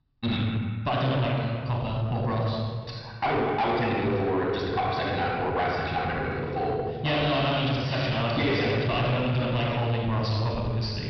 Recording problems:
distortion; heavy; 7 dB below the speech
wrong speed, natural pitch; too fast; 1.5 times normal speed
room echo; noticeable; dies away in 1.5 s
high frequencies cut off; noticeable; nothing above 5.5 kHz
off-mic speech; somewhat distant

